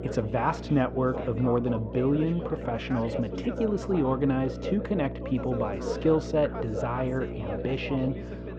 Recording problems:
muffled; very; fading above 2 kHz
background chatter; loud; throughout; 3 voices, 9 dB below the speech
electrical hum; noticeable; throughout; 60 Hz, 15 dB below the speech

